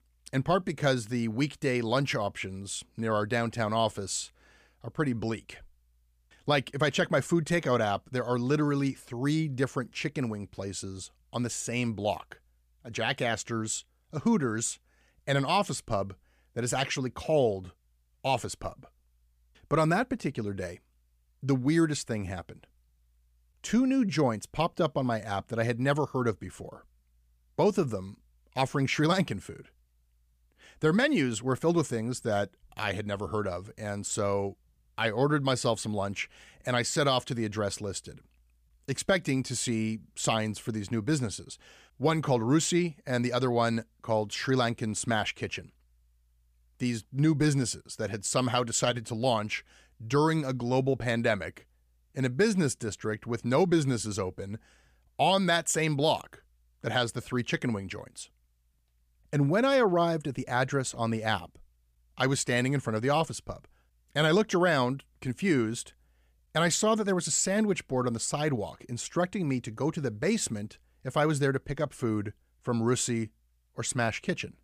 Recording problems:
none

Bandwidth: 15 kHz